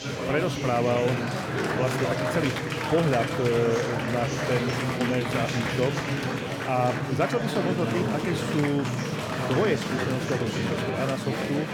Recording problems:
chatter from many people; very loud; throughout; as loud as the speech

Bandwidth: 17 kHz